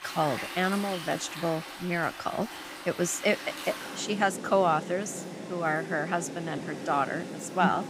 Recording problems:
rain or running water; loud; throughout; 9 dB below the speech

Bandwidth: 15.5 kHz